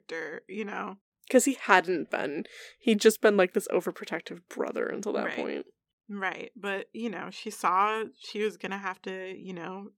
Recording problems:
none

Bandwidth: 17.5 kHz